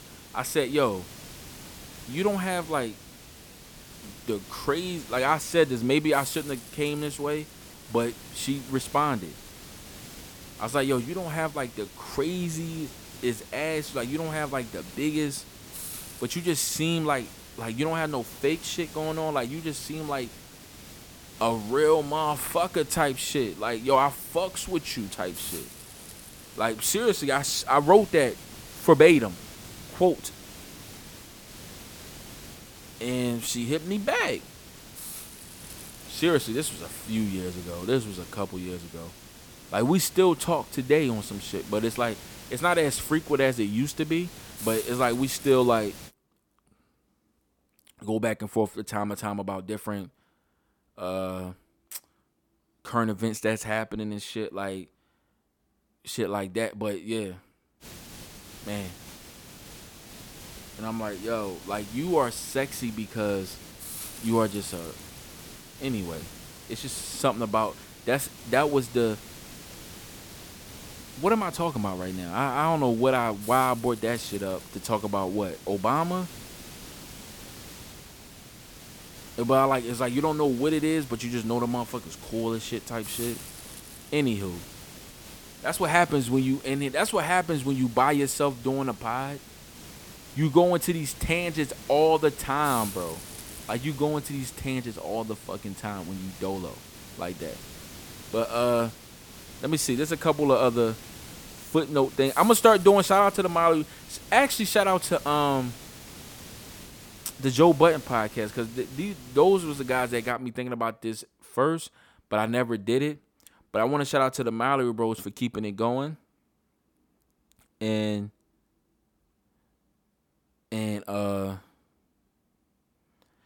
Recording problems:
hiss; noticeable; until 46 s and from 58 s to 1:50; 15 dB below the speech

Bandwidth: 18 kHz